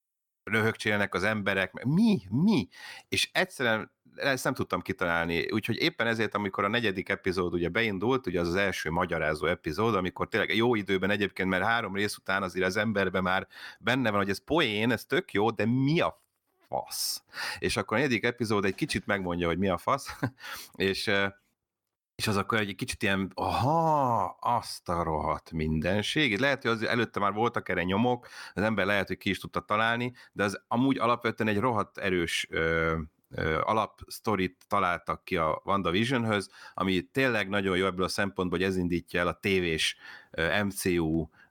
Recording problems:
none

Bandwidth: 18 kHz